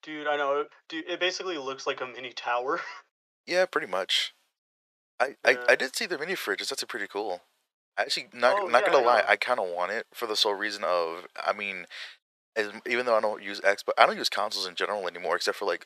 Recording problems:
thin; very; fading below 550 Hz

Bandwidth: 14.5 kHz